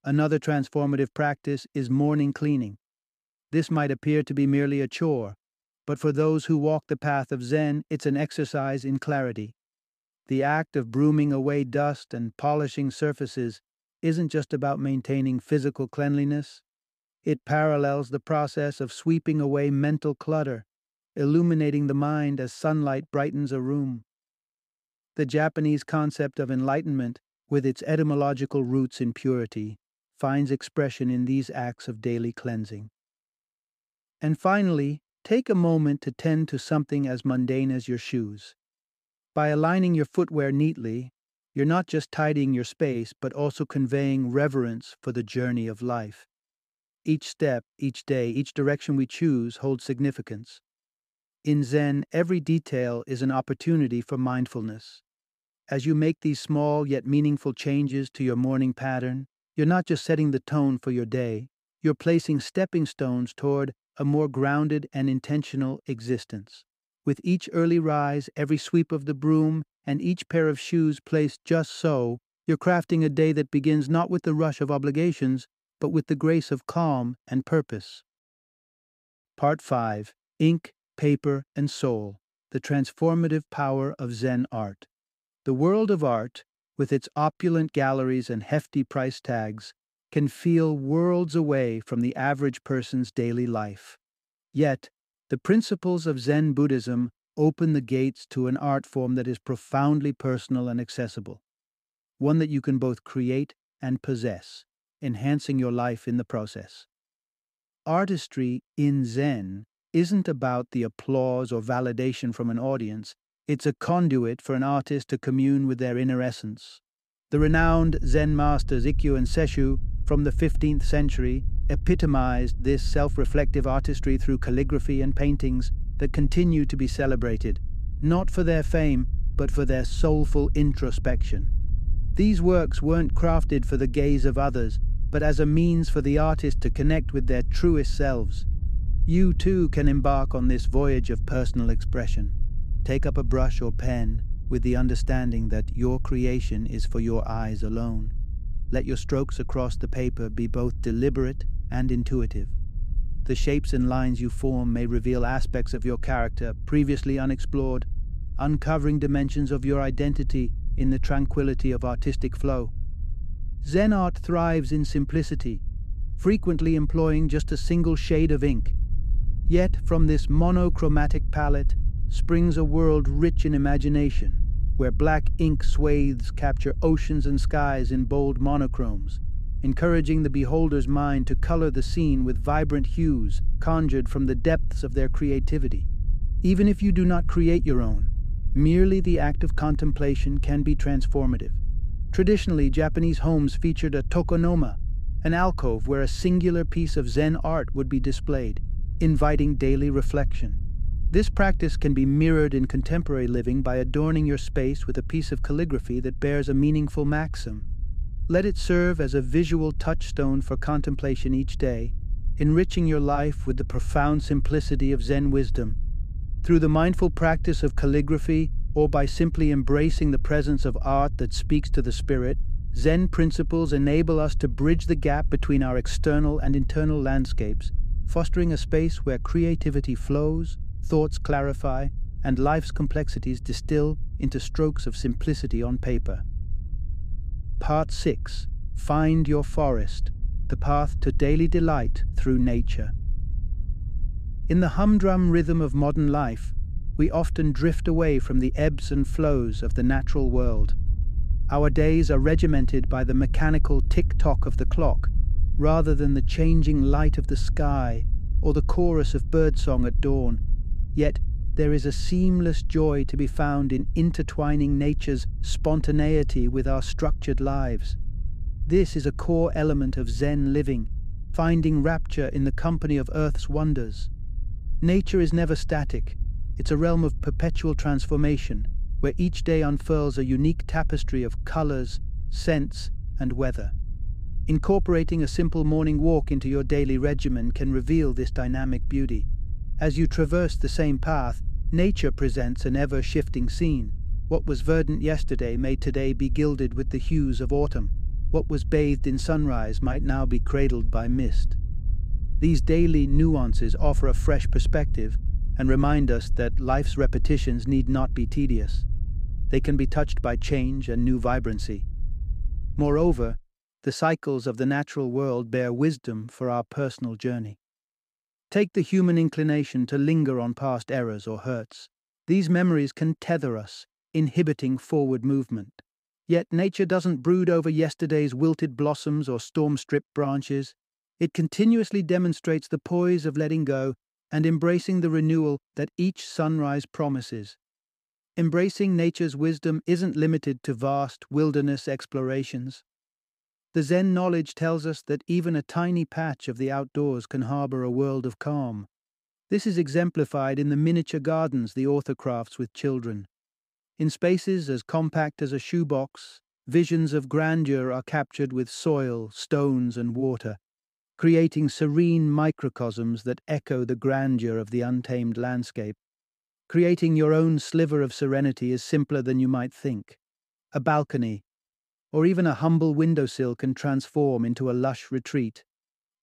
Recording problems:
low rumble; faint; from 1:57 to 5:13; 20 dB below the speech

